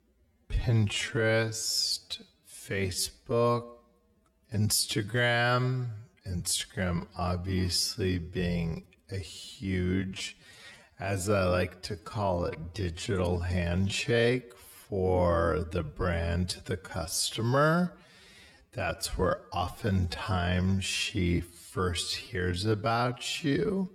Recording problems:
wrong speed, natural pitch; too slow; 0.5 times normal speed

